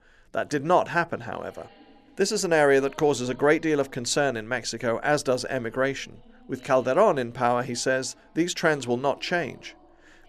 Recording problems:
background chatter; faint; throughout; 2 voices, 30 dB below the speech

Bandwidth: 13.5 kHz